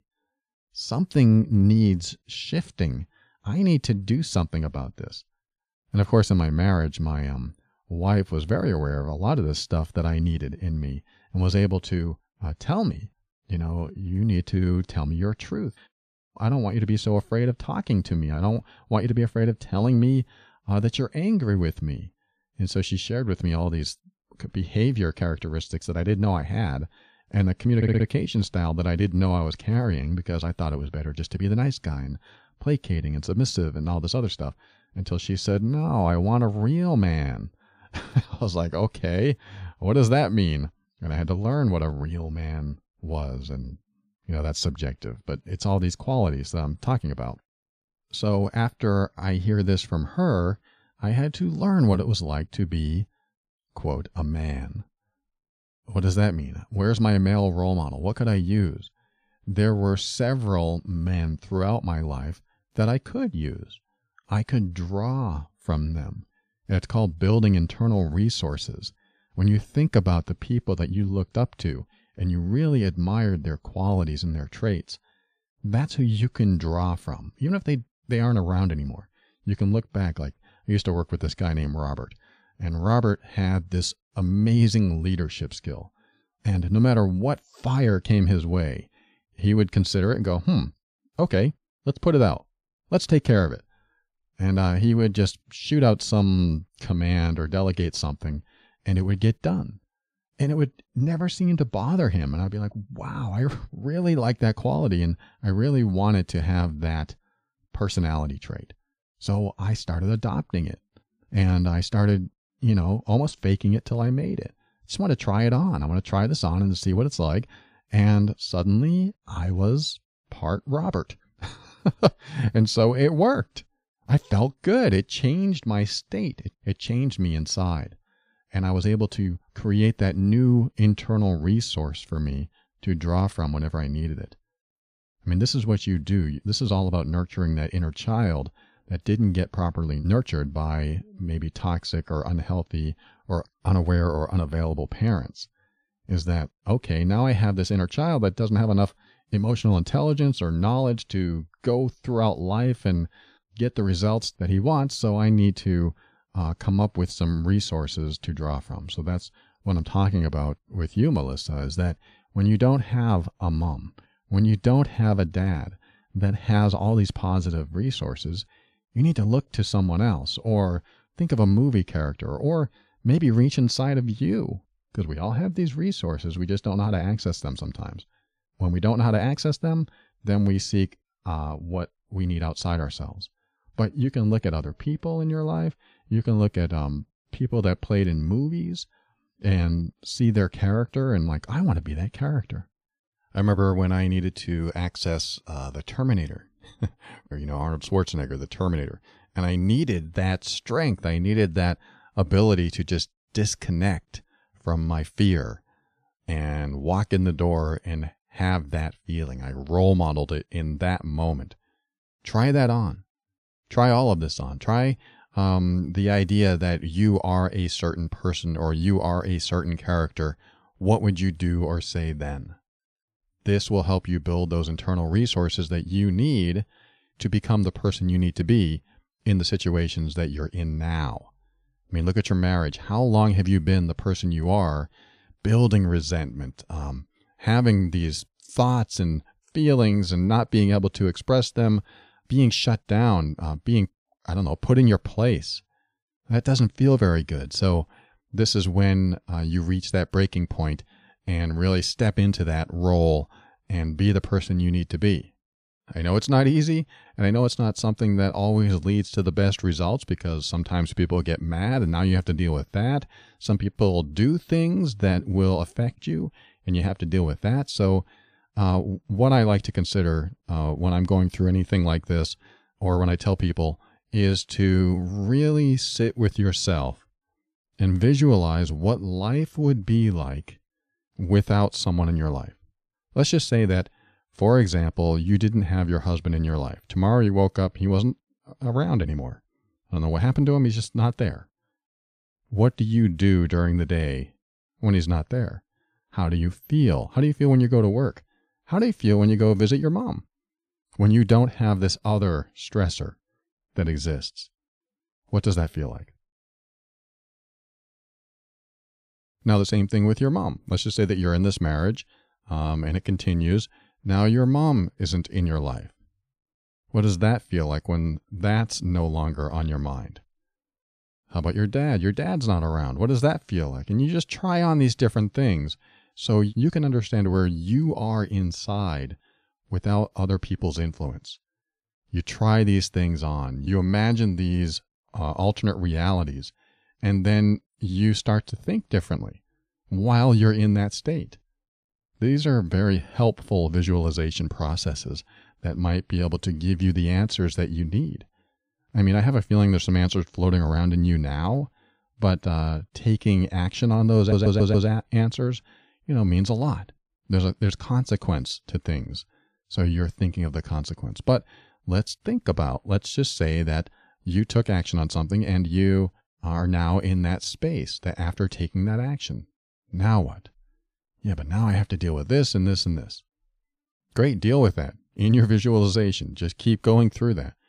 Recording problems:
audio stuttering; at 28 s and at 5:54

